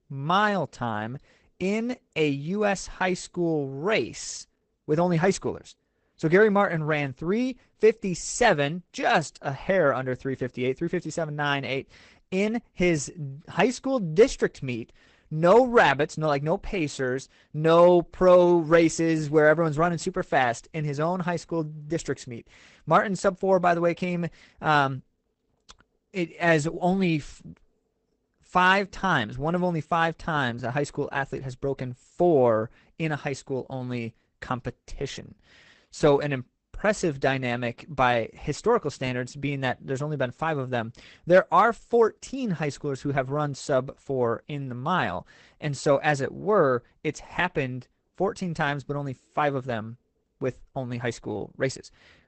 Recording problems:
garbled, watery; badly; nothing above 8 kHz

